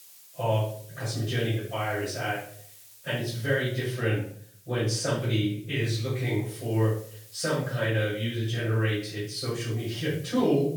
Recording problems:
off-mic speech; far
room echo; noticeable; dies away in 0.5 s
hiss; faint; throughout; 20 dB below the speech

